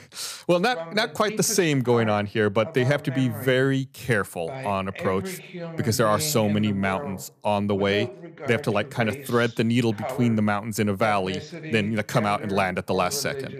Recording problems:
voice in the background; noticeable; throughout; 10 dB below the speech

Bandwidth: 14.5 kHz